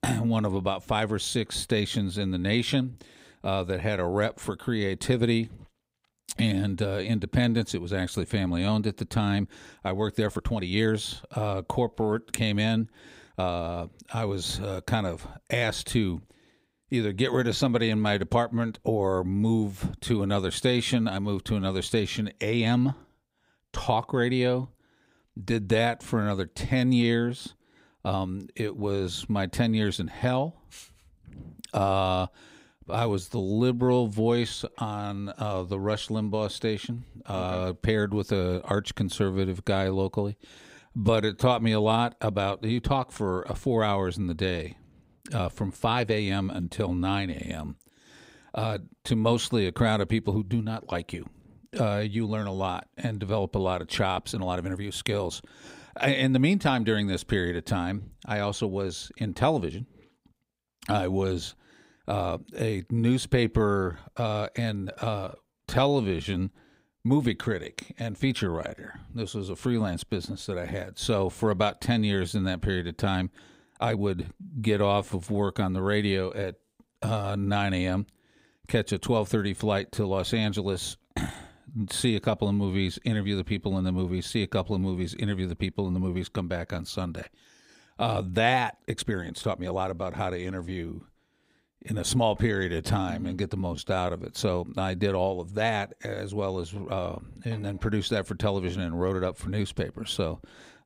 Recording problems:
uneven, jittery; strongly; from 9 s to 1:34

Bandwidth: 15.5 kHz